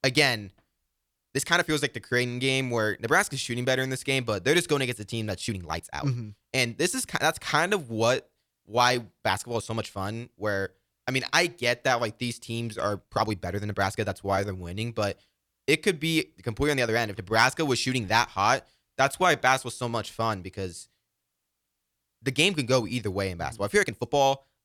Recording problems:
uneven, jittery; strongly; from 1 to 24 s

